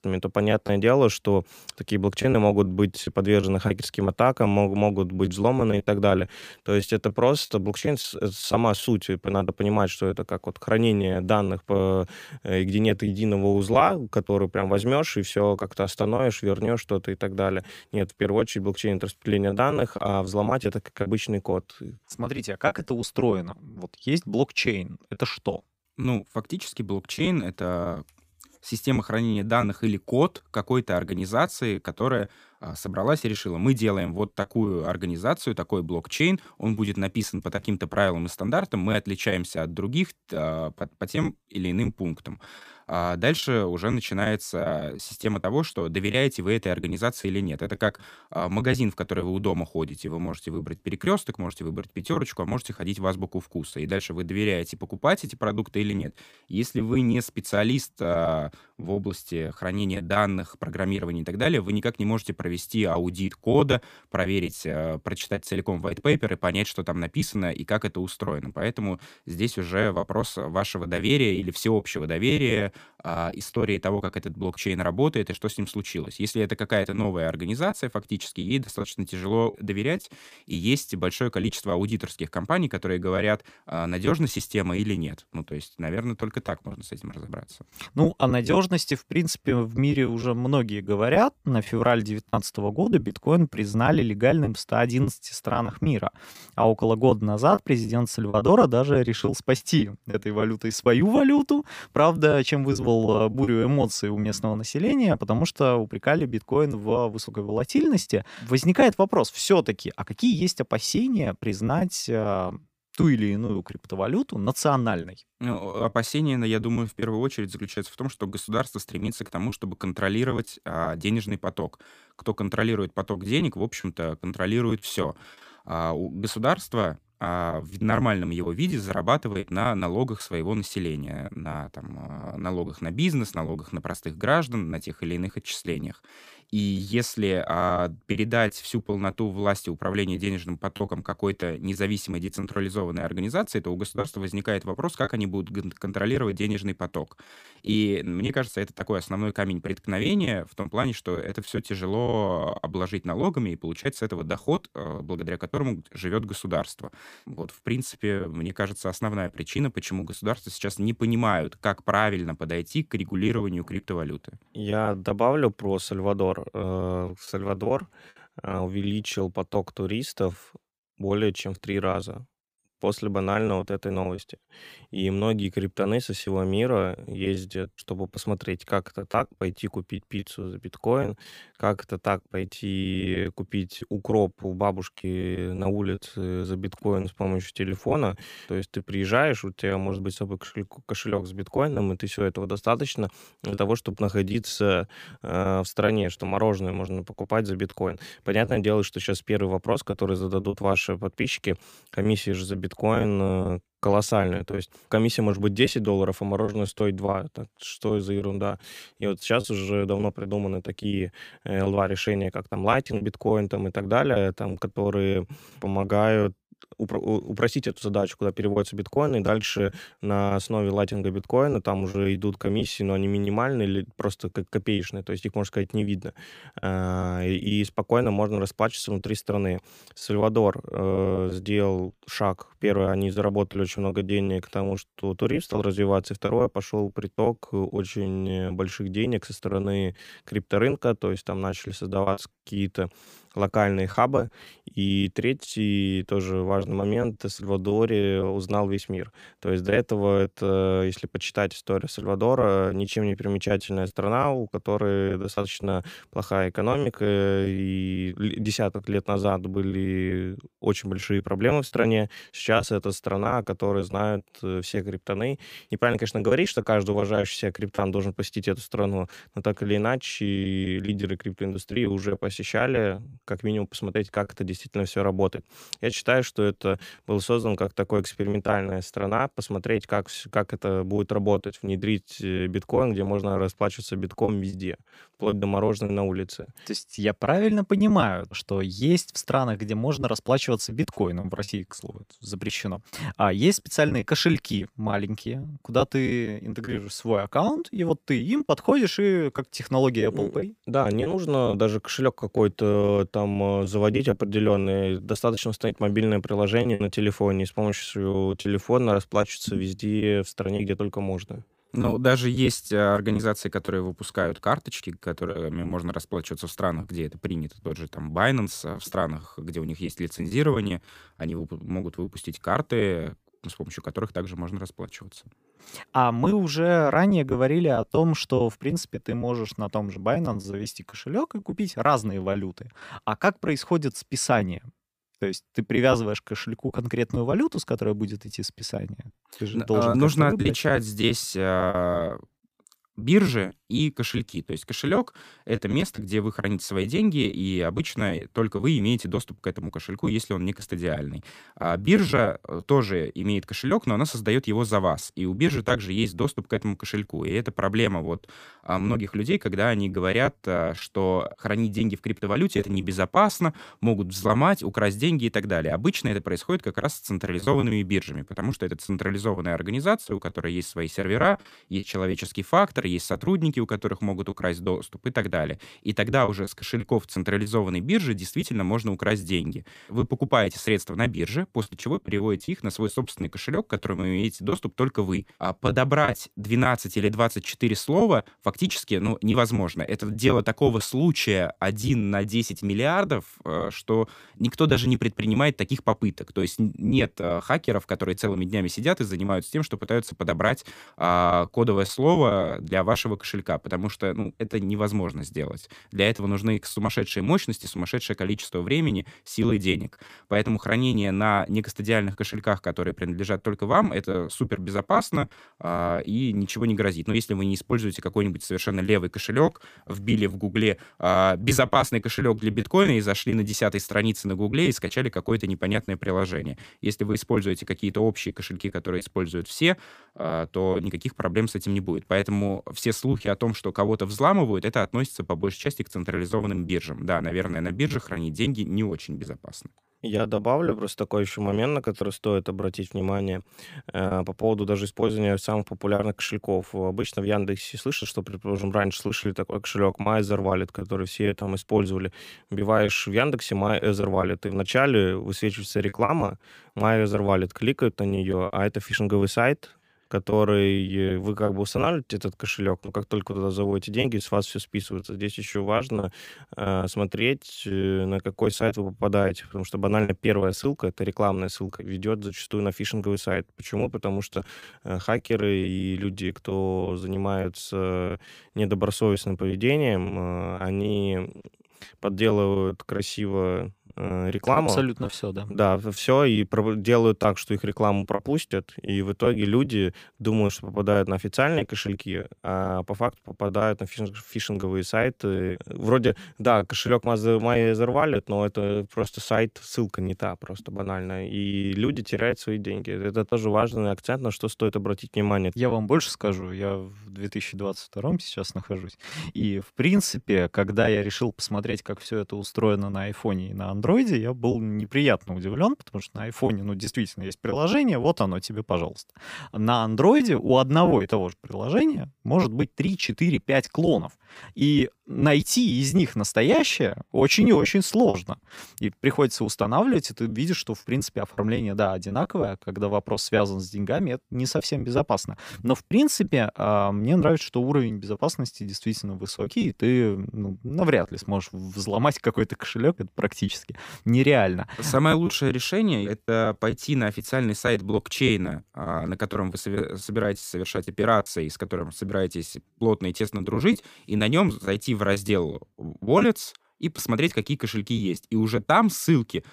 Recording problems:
choppy; very; 7% of the speech affected

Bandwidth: 15 kHz